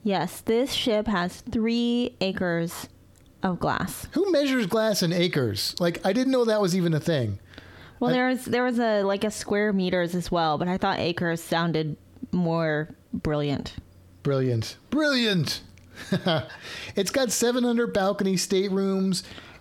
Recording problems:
squashed, flat; heavily

